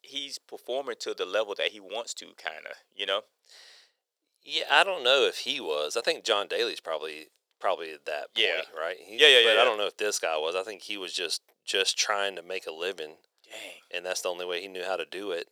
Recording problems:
thin; very; fading below 450 Hz

